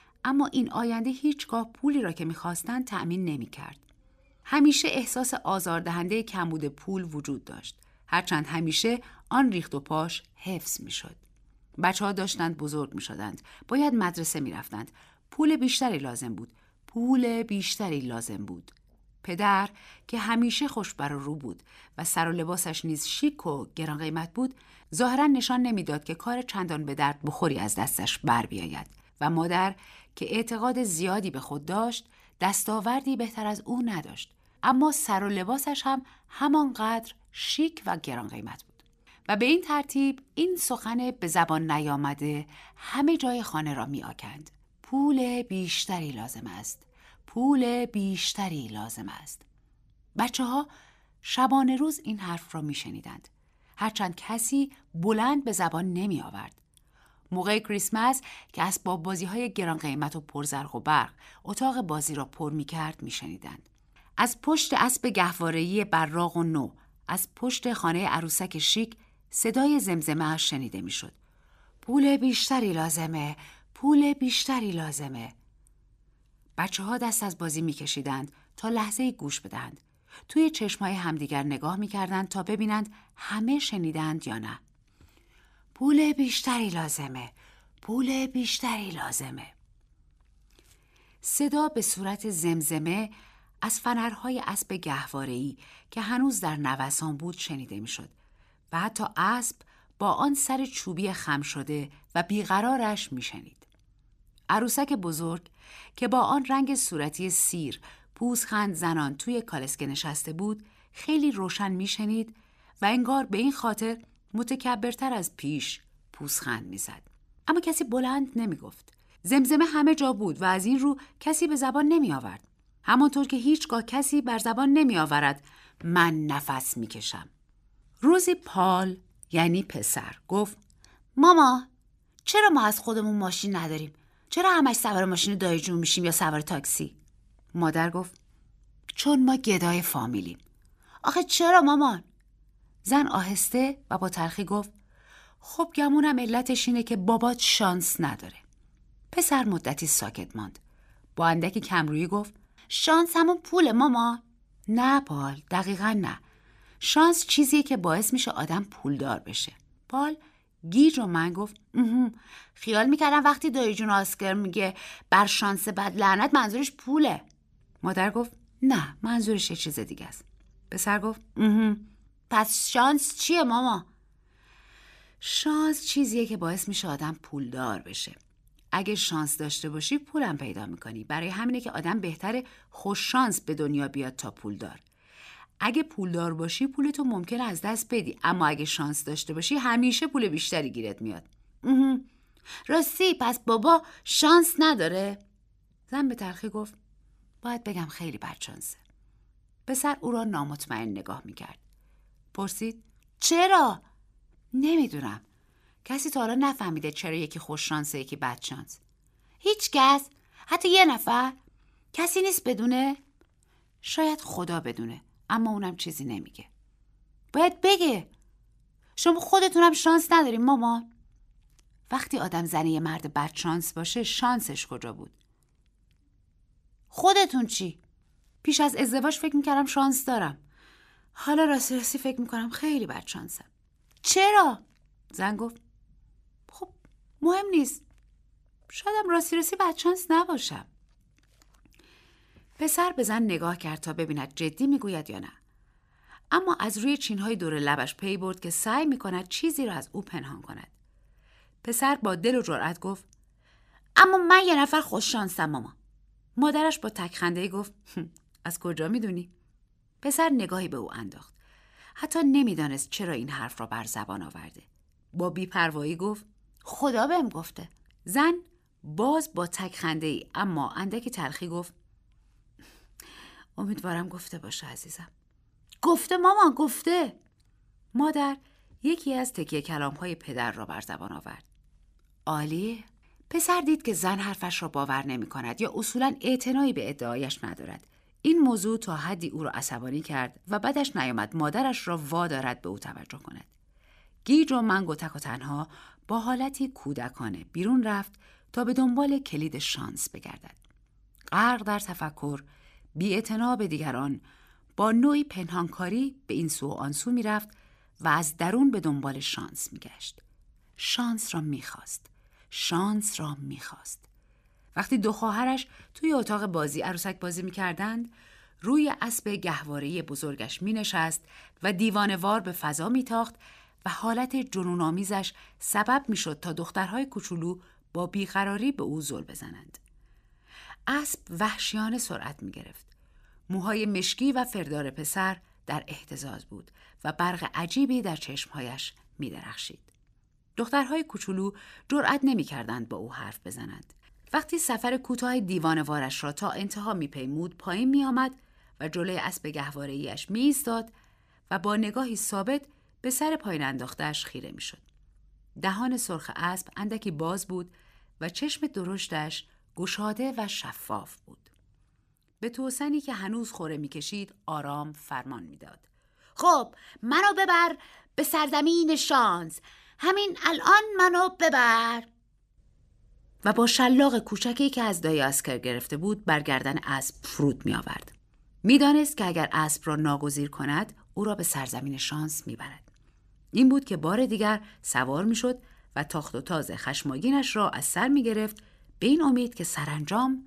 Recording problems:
none

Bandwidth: 14.5 kHz